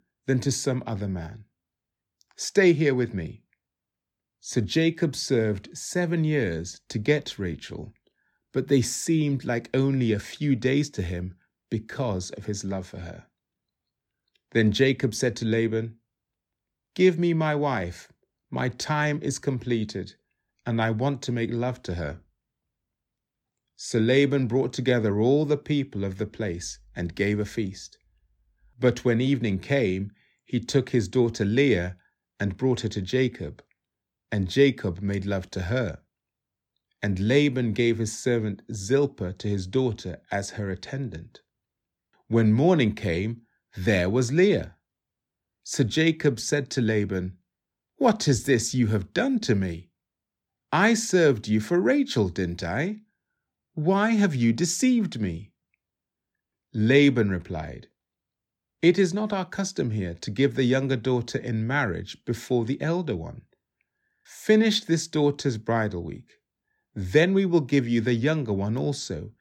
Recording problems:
none

